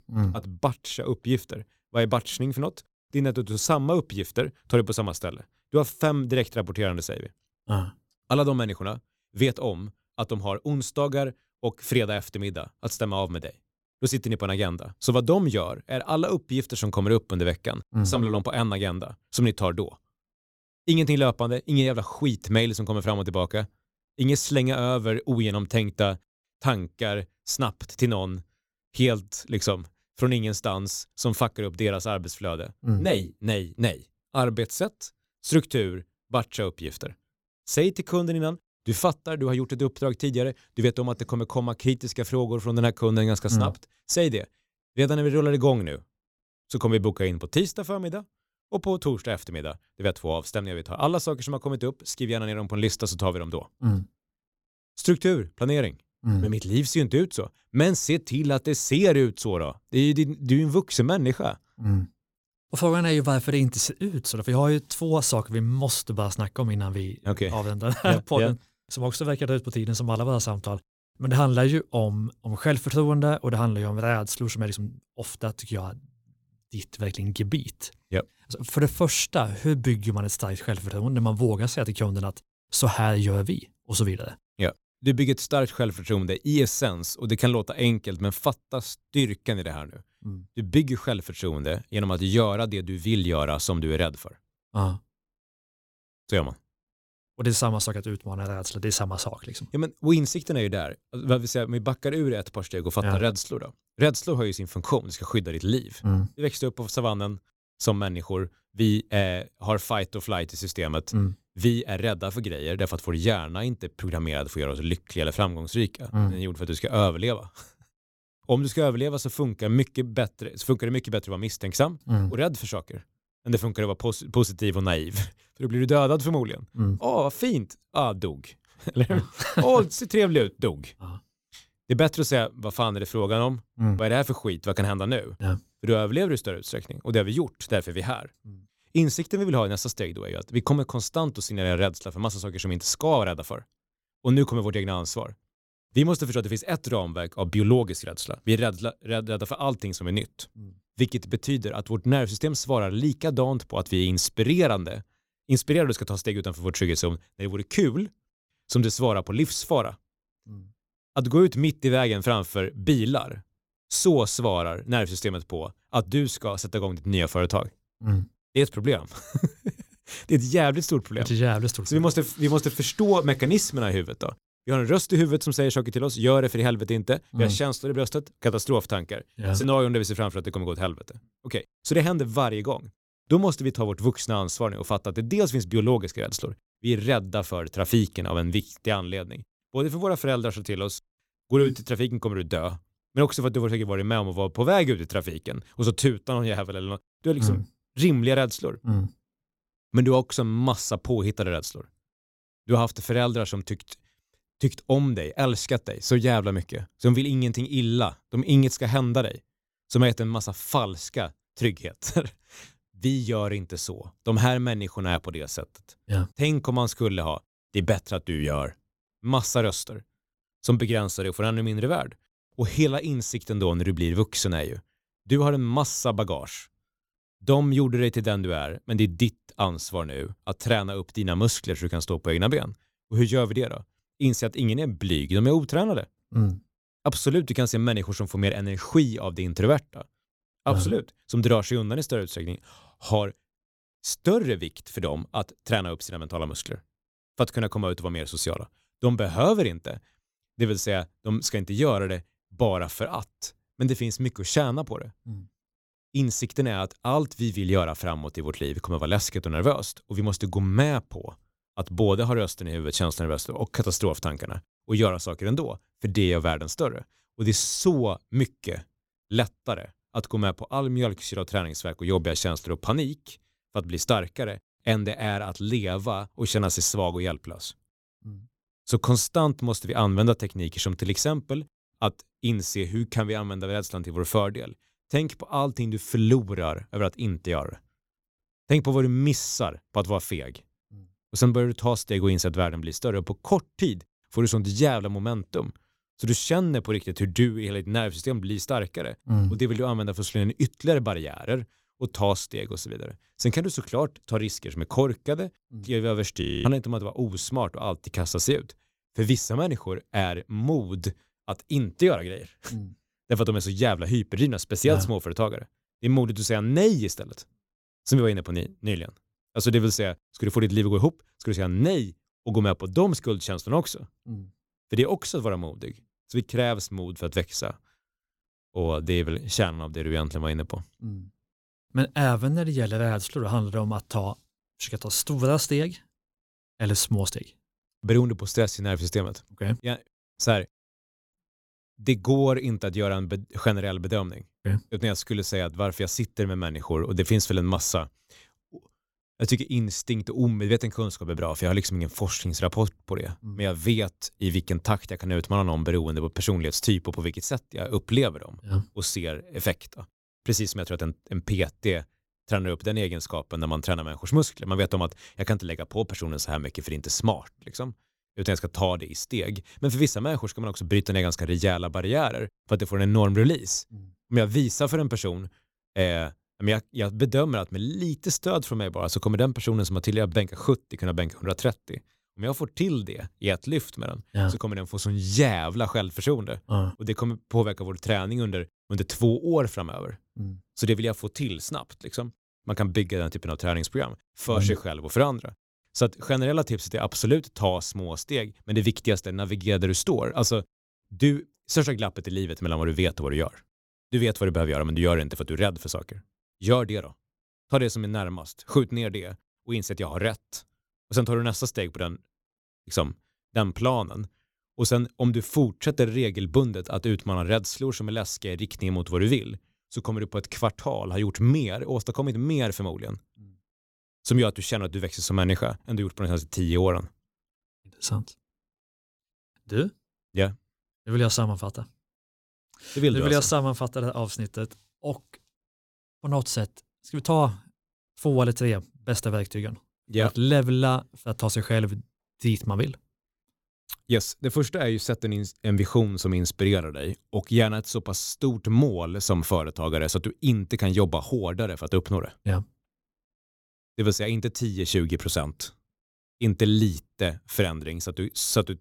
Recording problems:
audio freezing; at 5:06

